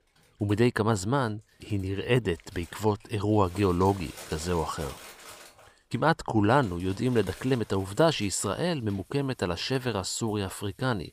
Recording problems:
household noises; faint; throughout; 20 dB below the speech

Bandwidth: 15 kHz